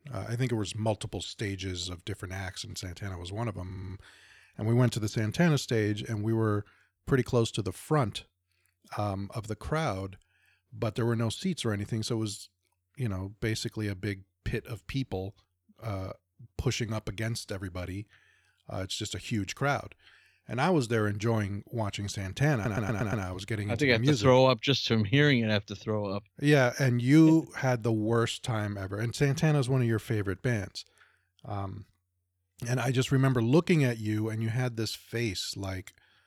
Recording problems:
audio stuttering; at 3.5 s and at 23 s

